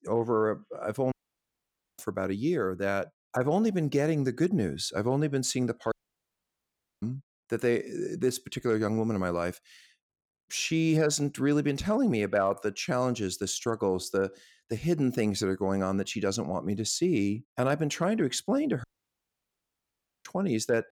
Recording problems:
audio cutting out; at 1 s for 1 s, at 6 s for 1 s and at 19 s for 1.5 s

